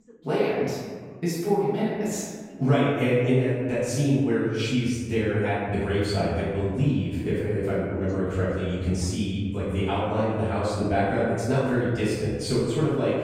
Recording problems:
room echo; strong; dies away in 1.4 s
off-mic speech; far
voice in the background; faint; throughout; 25 dB below the speech

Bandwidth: 16 kHz